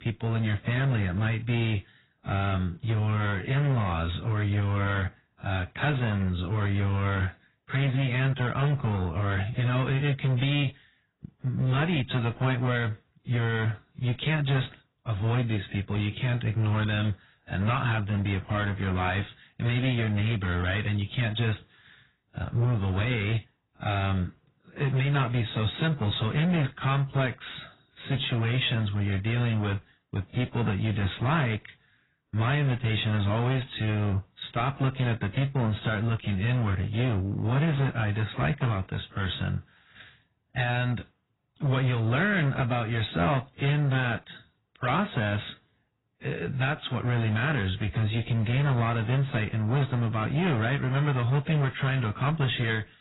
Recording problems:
garbled, watery; badly; nothing above 4 kHz
distortion; slight; 14% of the sound clipped

